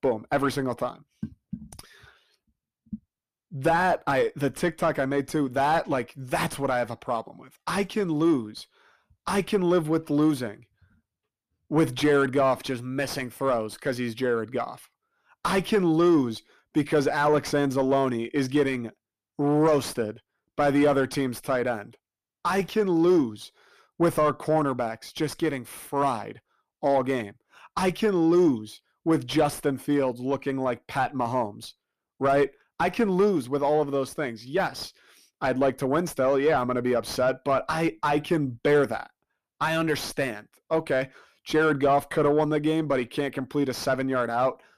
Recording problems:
distortion; slight; 10 dB below the speech

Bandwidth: 14.5 kHz